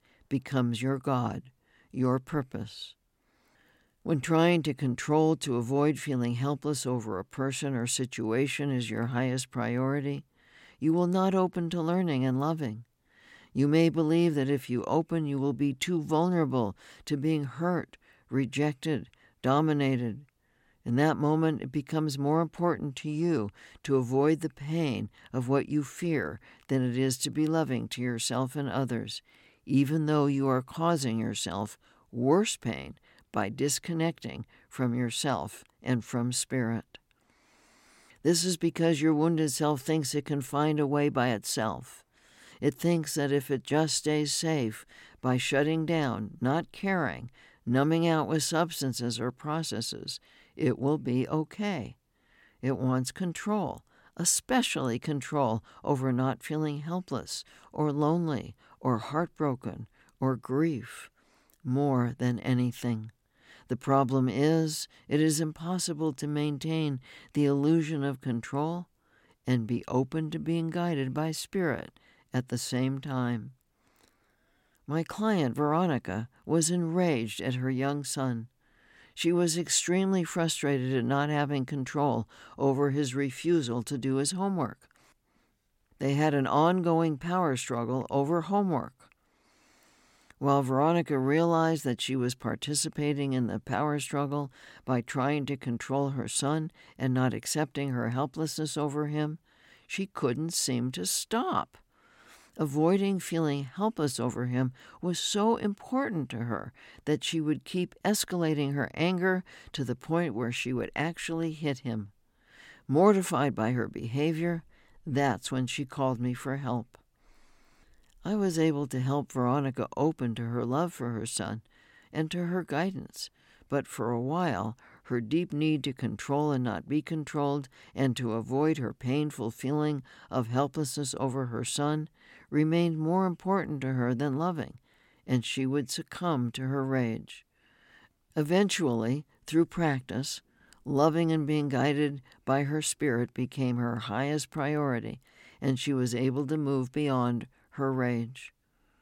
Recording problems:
none

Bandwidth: 16.5 kHz